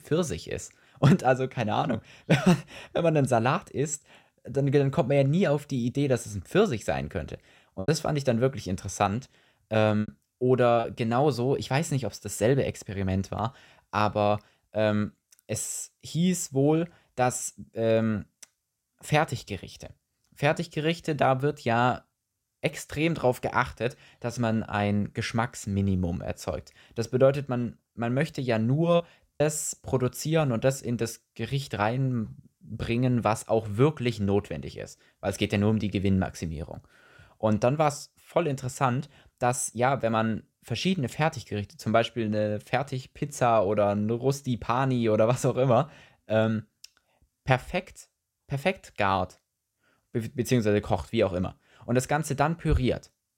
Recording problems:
choppy; very; from 8 to 11 s and at 29 s; 6% of the speech affected

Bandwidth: 16 kHz